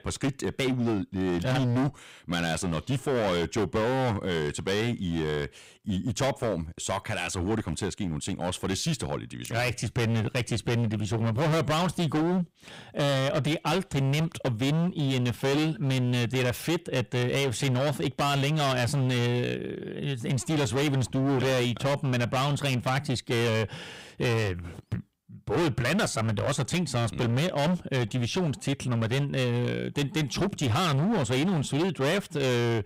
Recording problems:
distortion; heavy; 23% of the sound clipped

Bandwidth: 15.5 kHz